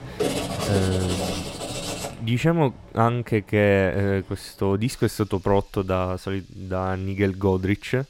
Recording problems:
household noises; loud; throughout; 4 dB below the speech

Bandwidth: 16 kHz